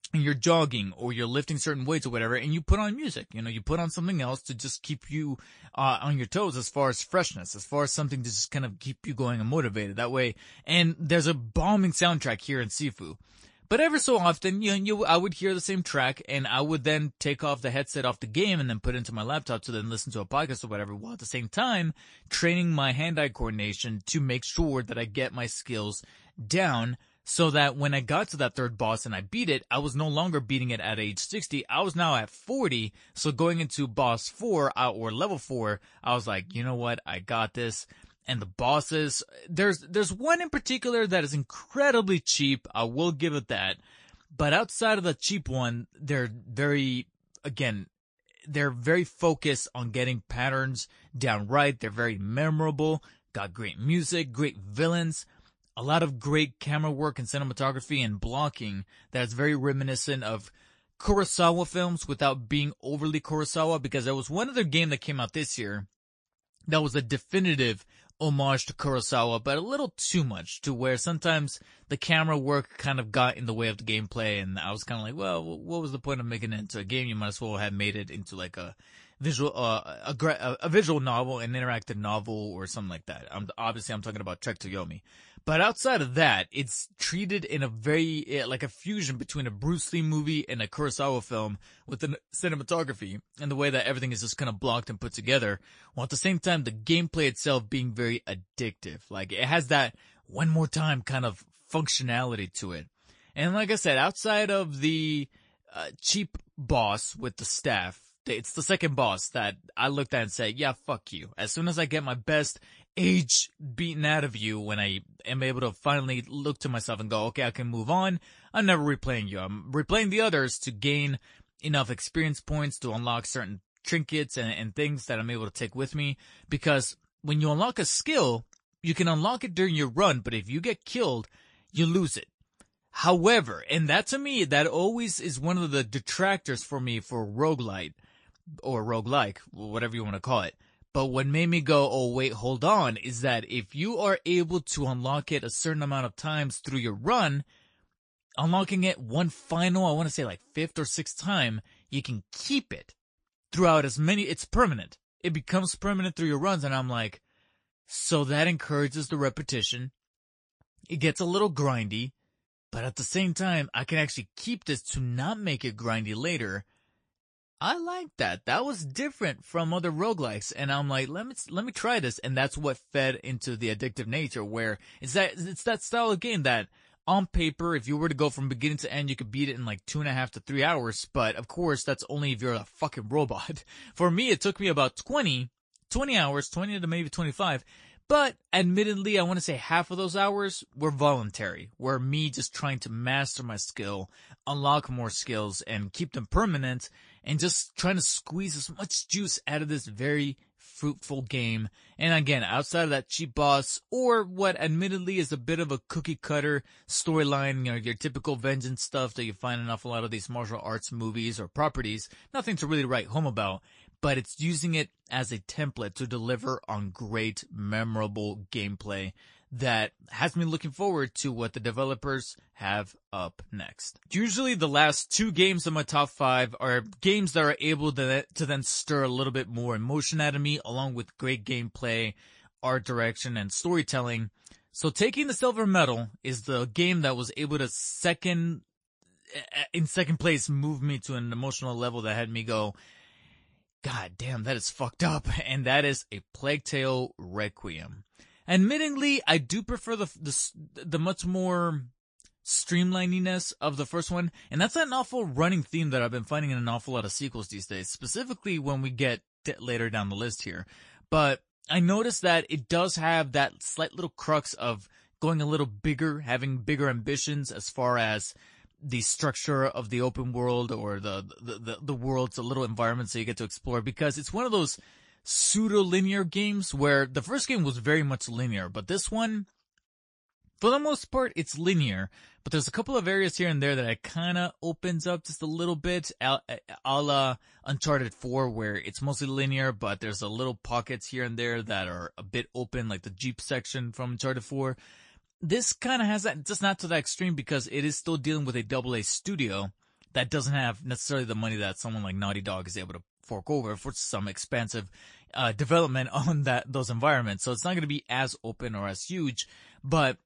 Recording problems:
garbled, watery; slightly; nothing above 9 kHz

